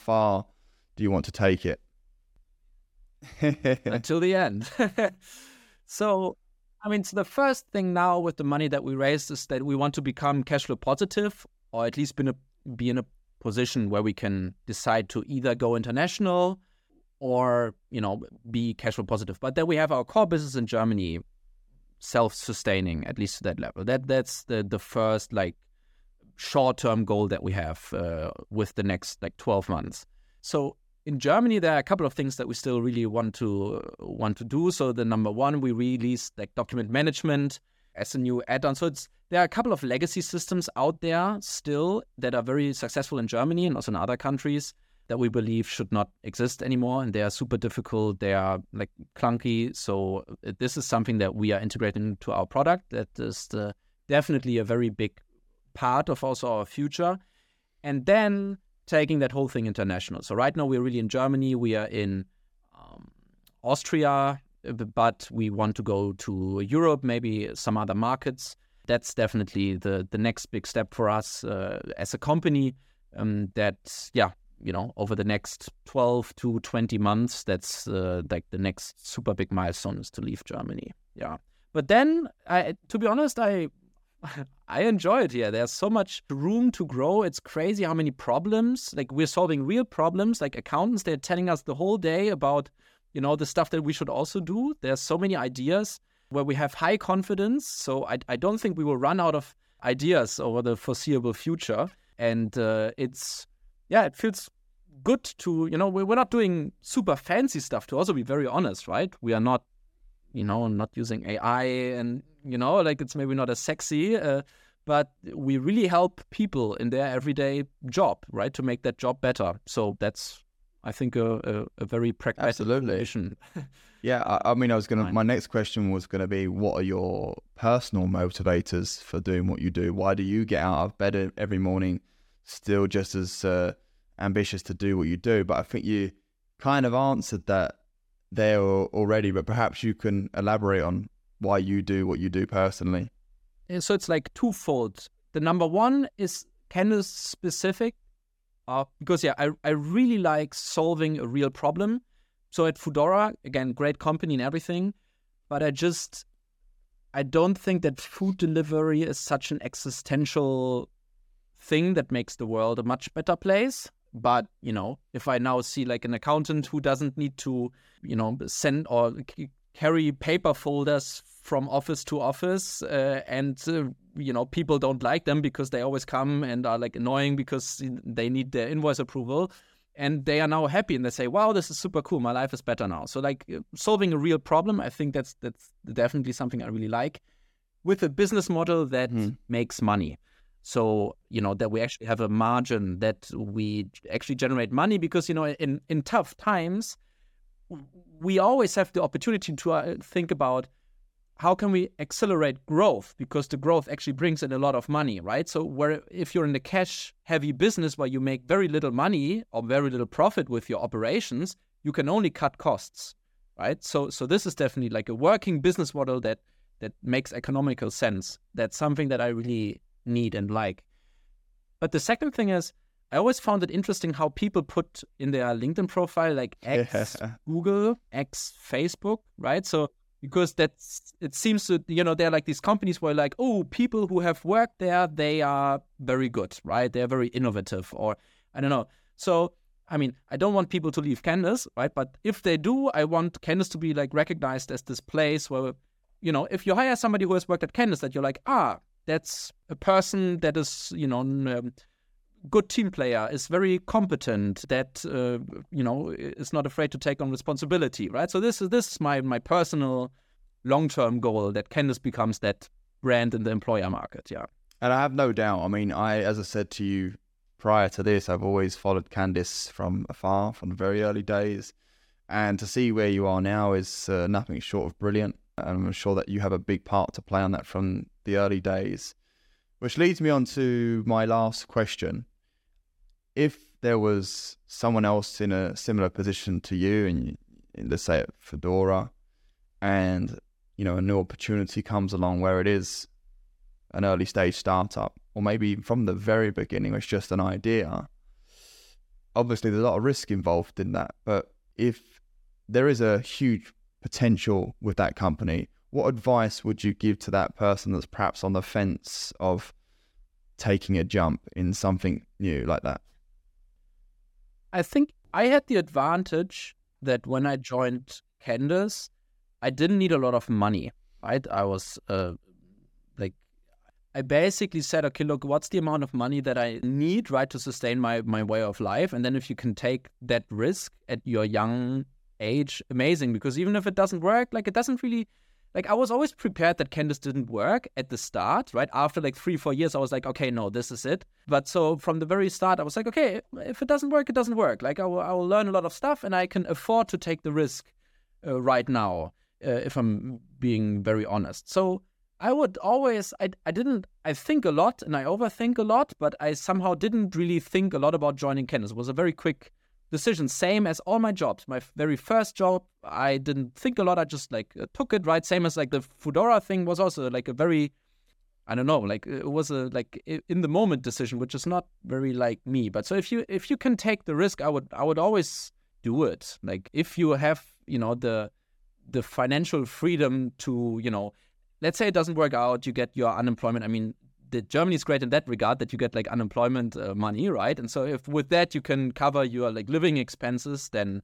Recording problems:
none

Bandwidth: 17.5 kHz